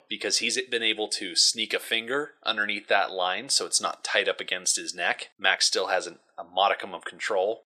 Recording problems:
thin; very; fading below 550 Hz

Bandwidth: 13.5 kHz